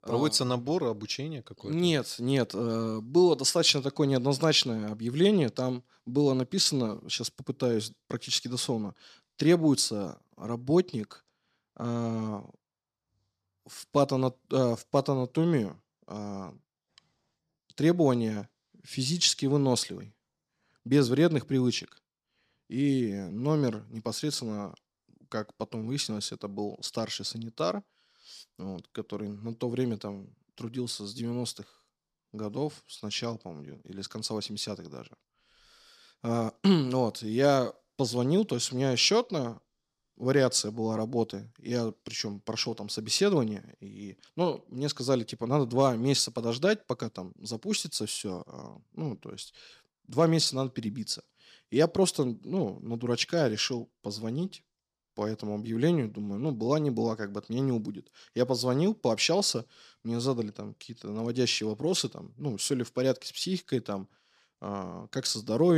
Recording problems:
abrupt cut into speech; at the end

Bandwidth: 14.5 kHz